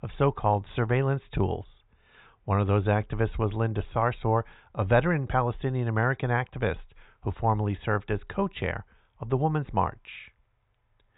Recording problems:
high frequencies cut off; severe; nothing above 4 kHz

